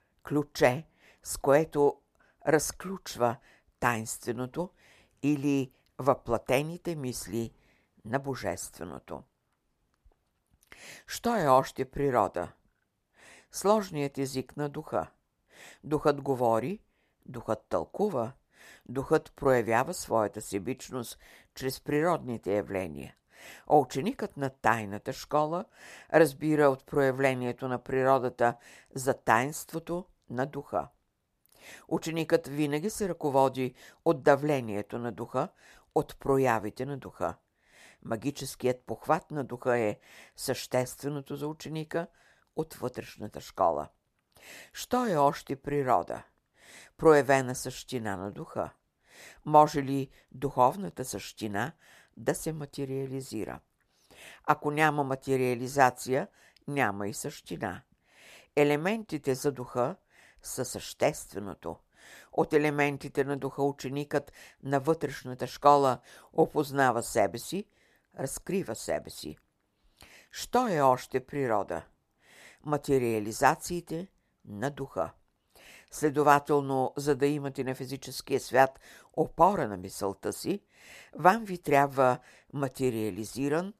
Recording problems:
none

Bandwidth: 14.5 kHz